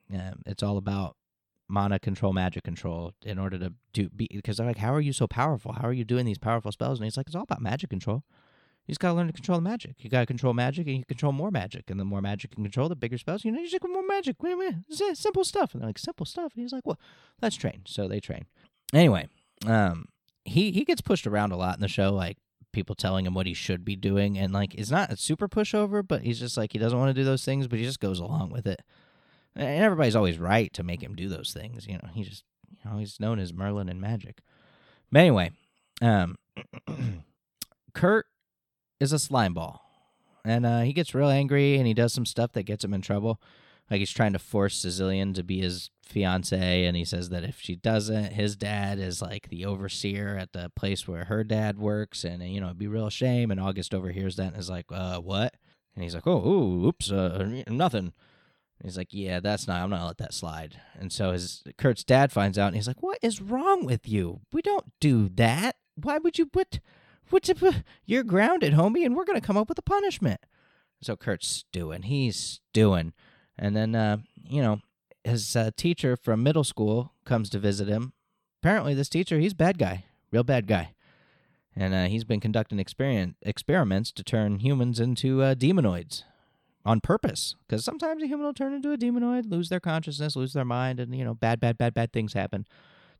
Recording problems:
none

